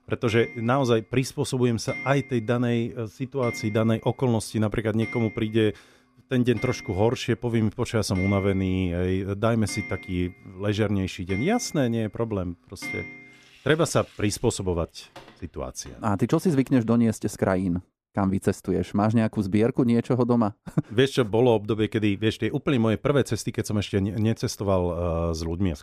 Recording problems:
household noises; noticeable; until 17 s; 15 dB below the speech

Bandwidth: 14.5 kHz